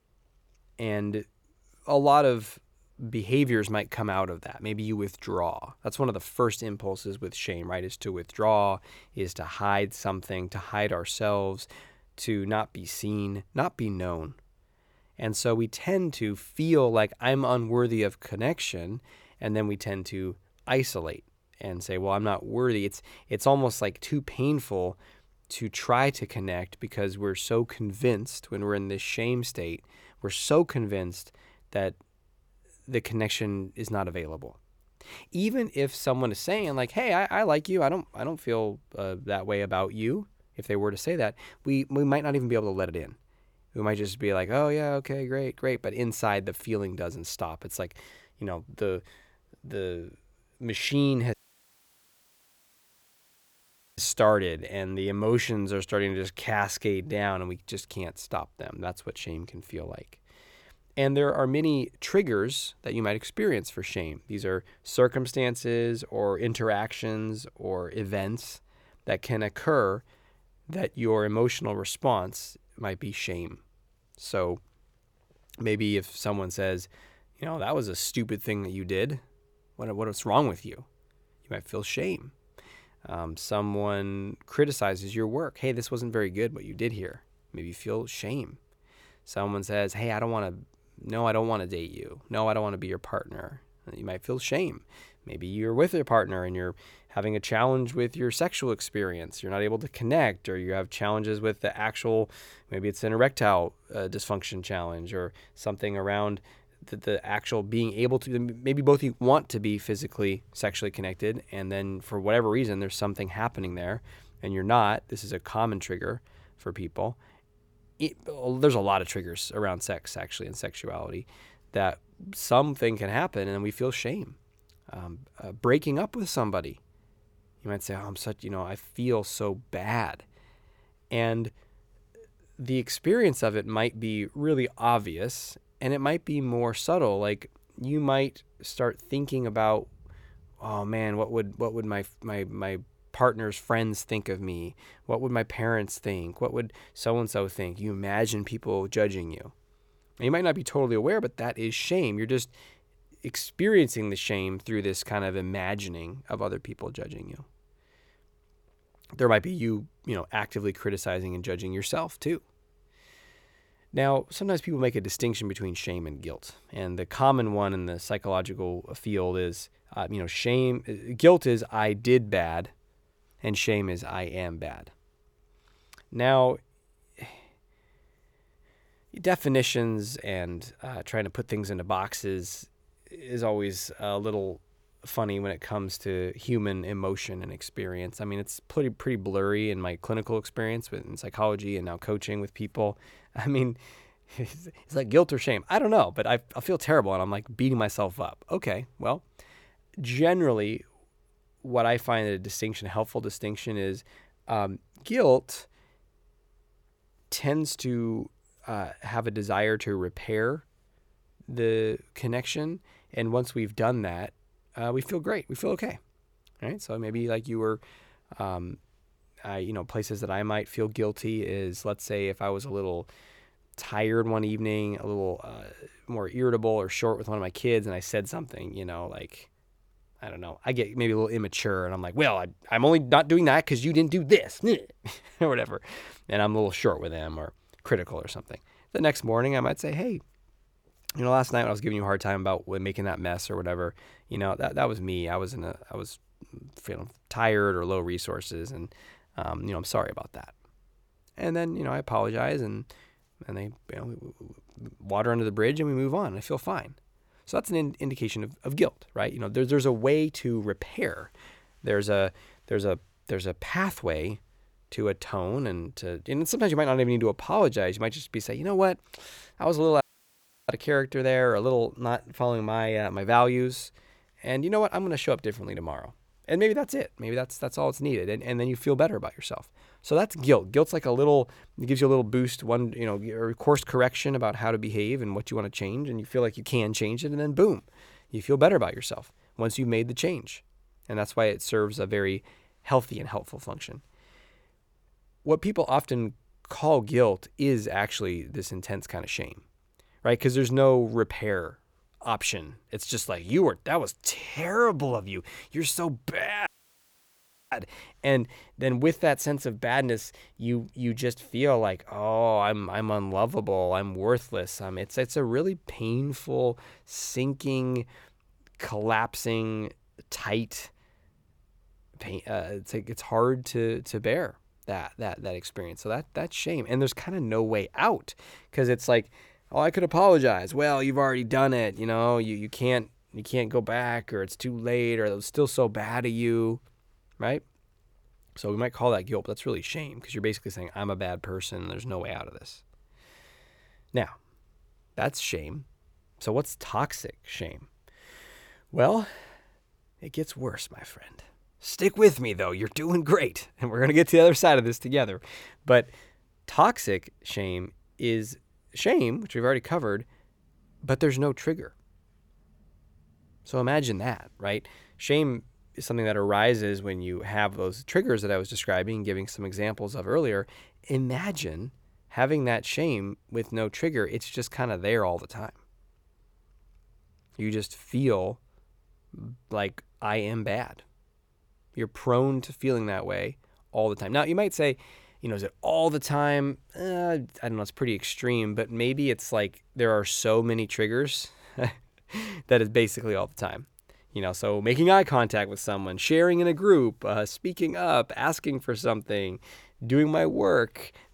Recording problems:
audio cutting out; at 51 s for 2.5 s, at 4:30 for 0.5 s and at 5:07 for 1 s

